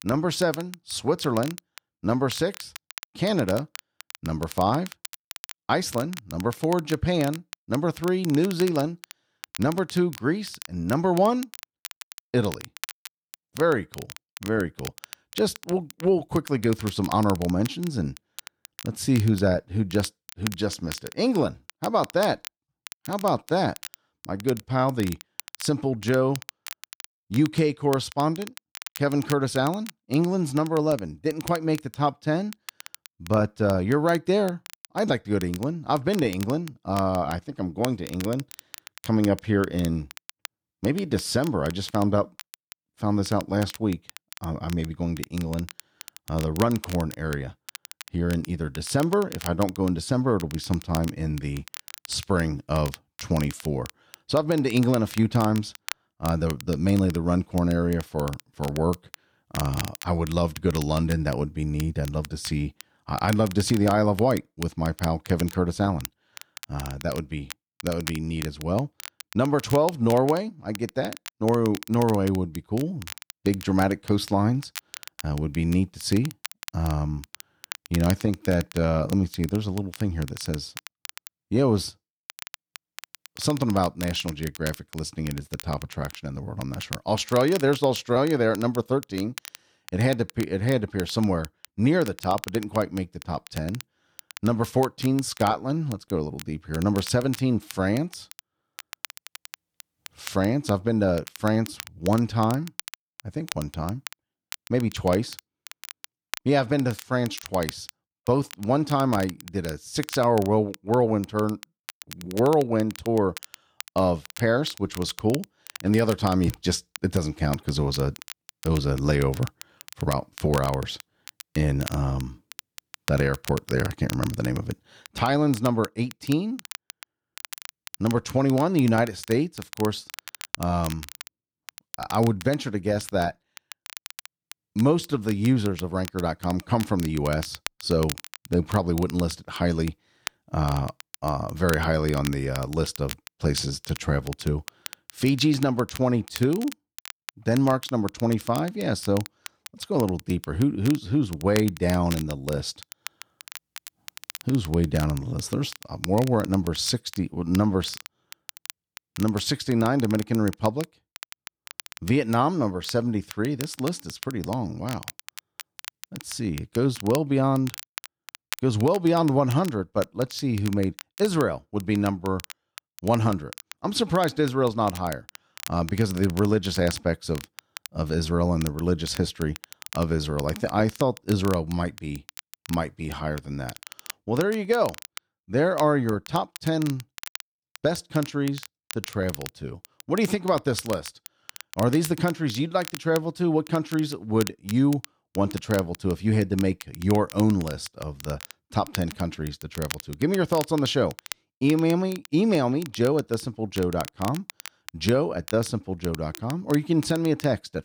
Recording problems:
crackle, like an old record; noticeable; 15 dB below the speech

